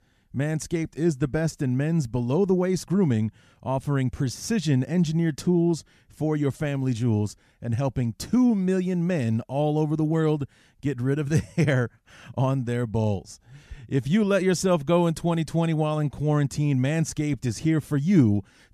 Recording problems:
none

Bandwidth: 14 kHz